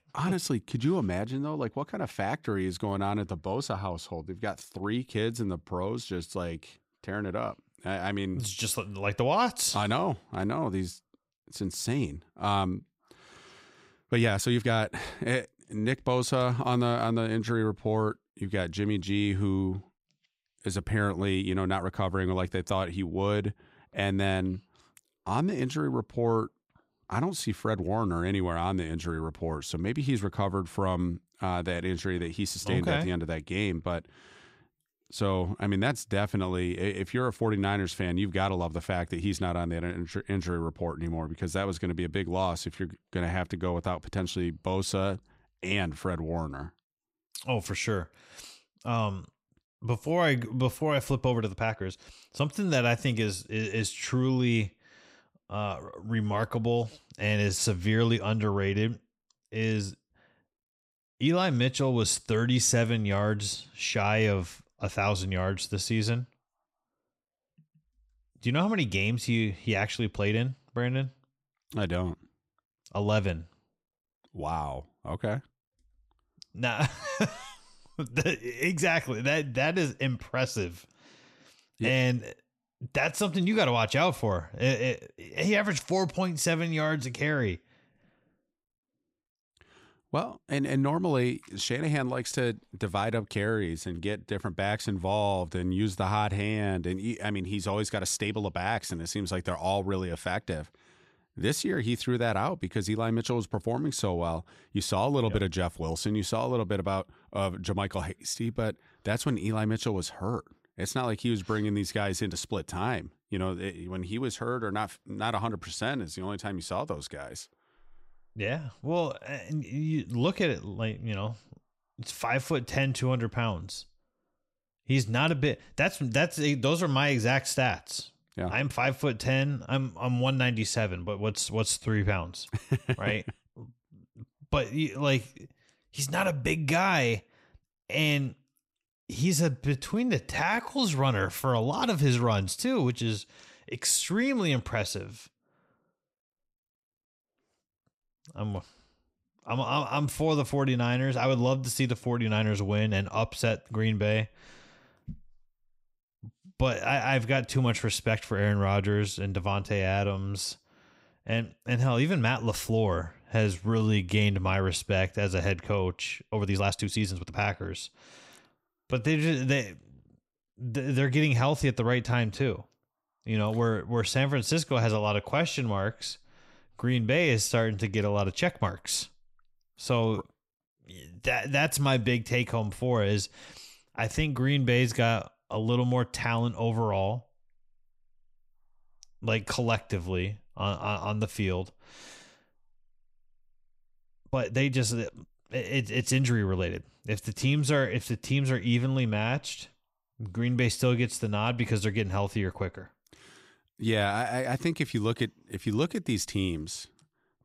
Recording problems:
uneven, jittery; strongly; from 14 s to 3:15

